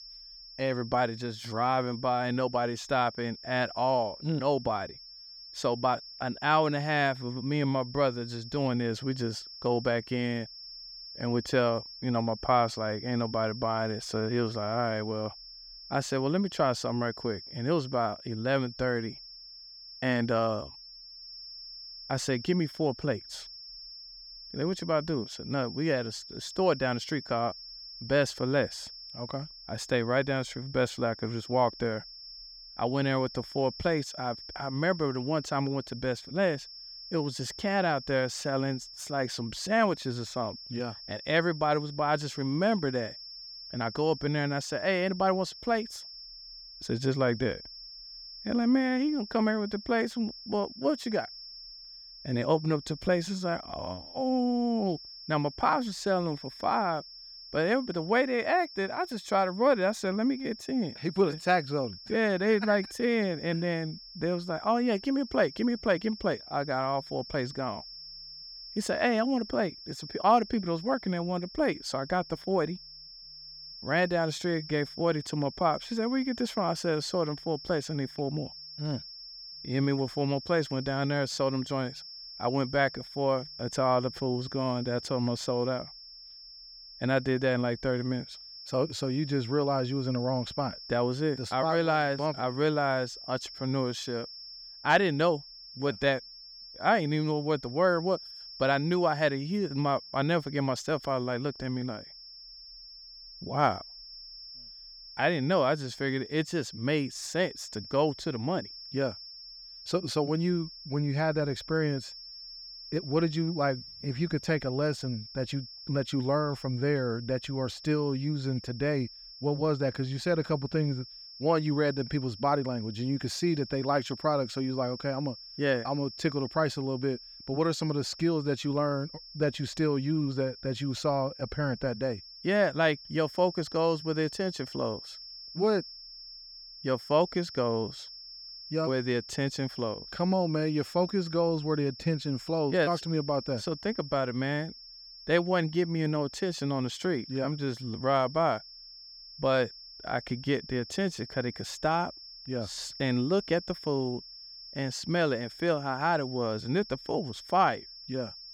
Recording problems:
high-pitched whine; noticeable; throughout; 5.5 kHz, 15 dB below the speech

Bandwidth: 18 kHz